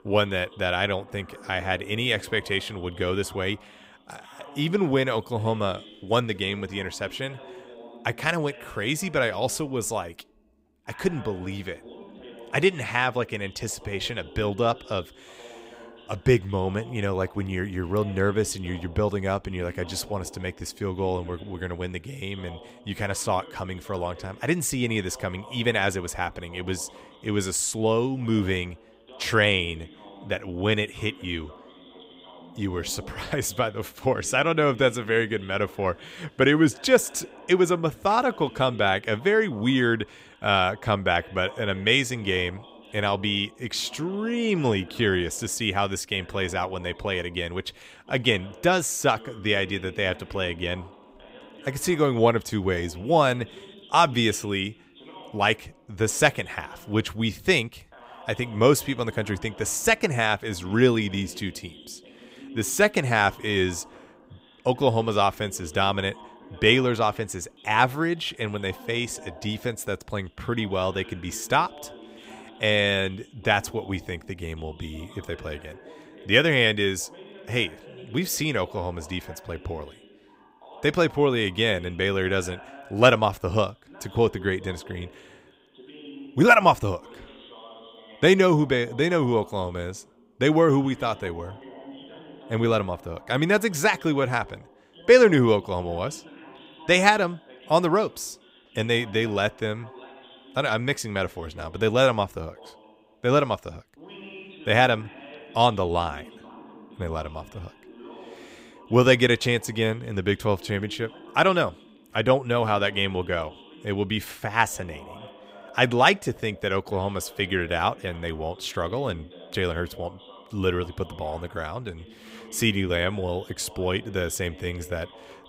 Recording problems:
voice in the background; faint; throughout; 20 dB below the speech

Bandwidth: 15.5 kHz